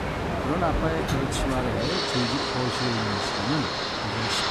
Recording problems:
train or aircraft noise; very loud; throughout; 3 dB above the speech

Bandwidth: 14.5 kHz